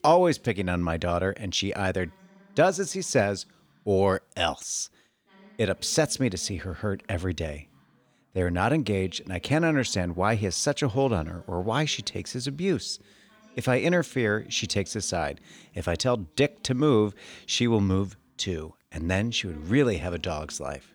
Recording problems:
background chatter; faint; throughout; 2 voices, 30 dB below the speech

